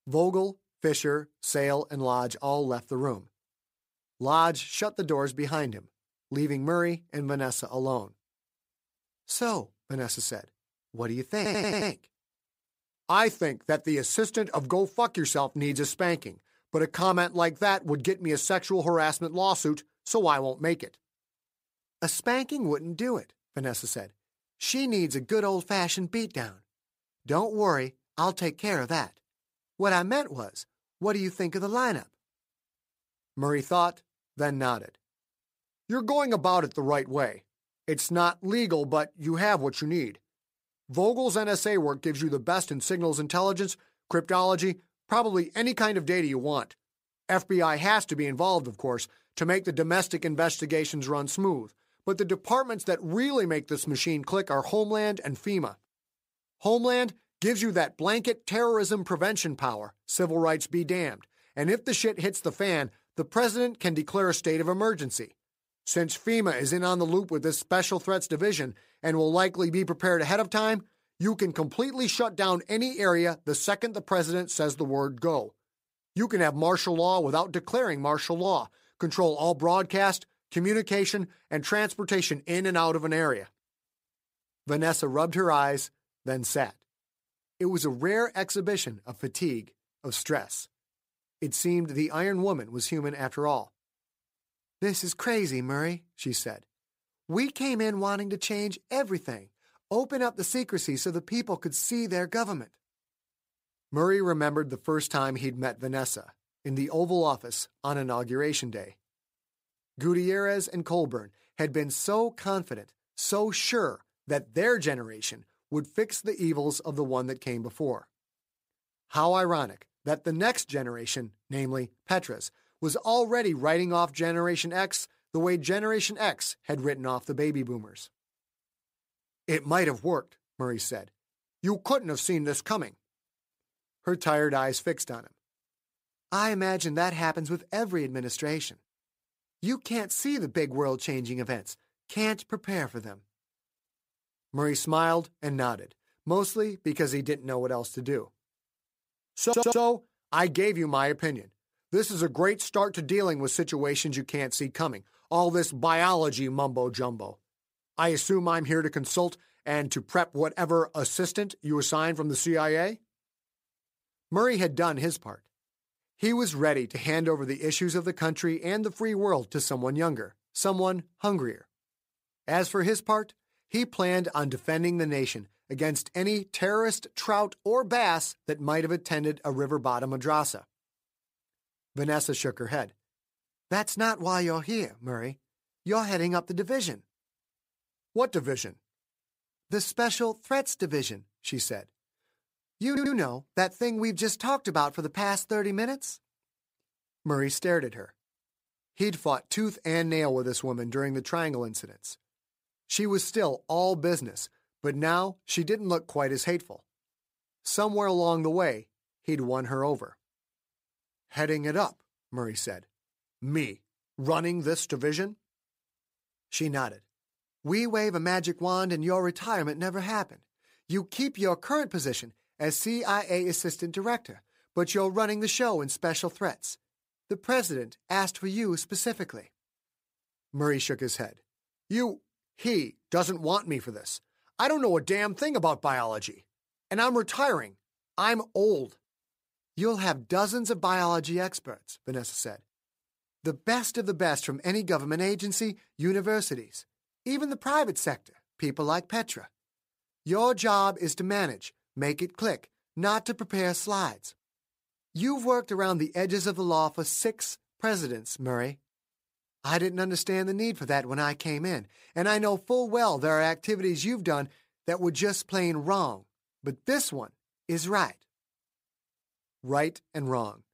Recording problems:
audio stuttering; at 11 s, at 2:29 and at 3:13

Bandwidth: 15.5 kHz